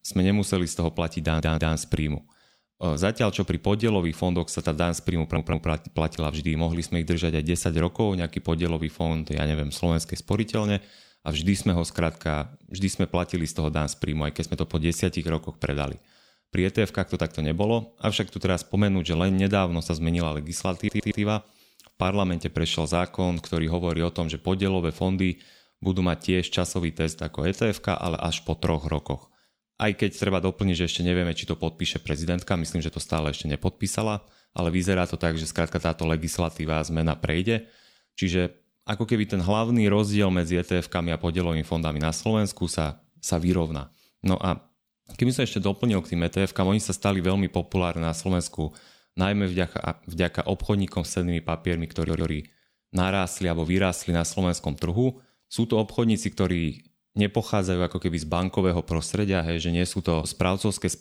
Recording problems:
audio stuttering; 4 times, first at 1 s

